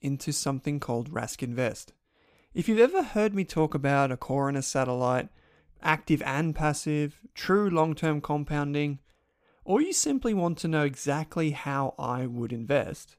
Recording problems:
none

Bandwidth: 15 kHz